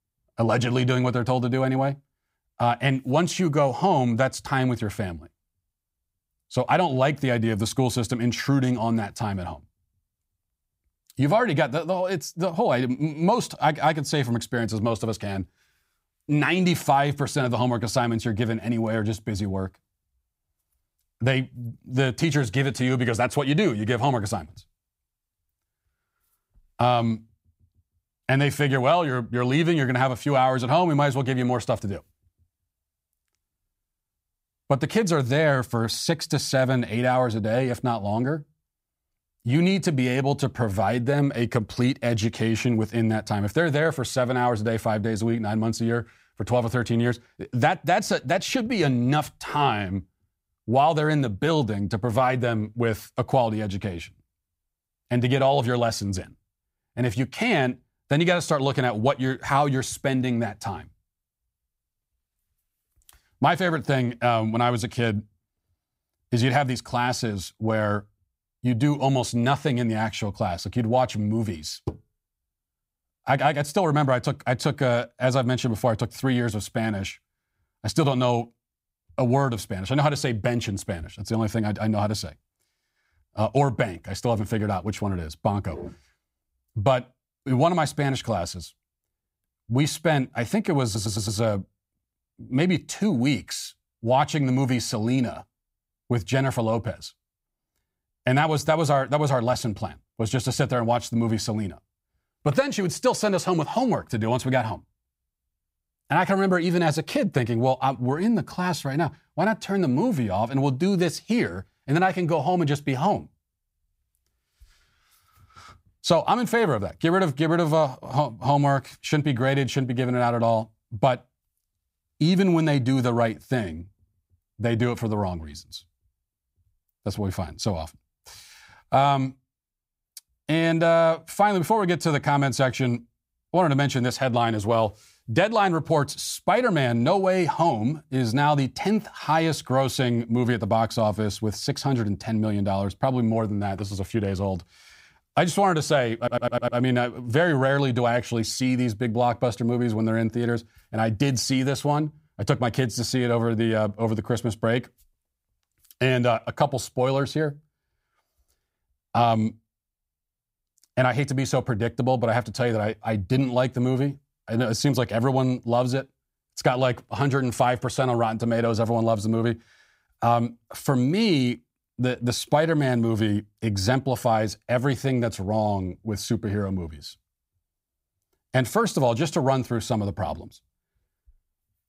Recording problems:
audio stuttering; at 1:31 and at 2:26

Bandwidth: 15.5 kHz